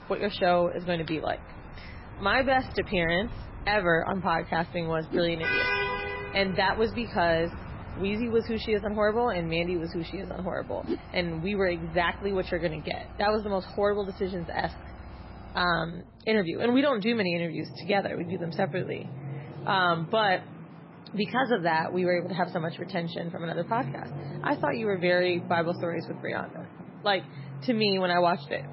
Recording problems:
garbled, watery; badly
traffic noise; noticeable; throughout; 10 dB below the speech

